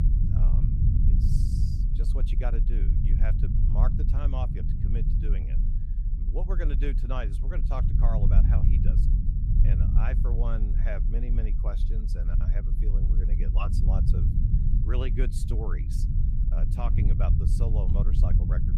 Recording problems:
low rumble; loud; throughout; 2 dB below the speech

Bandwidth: 15 kHz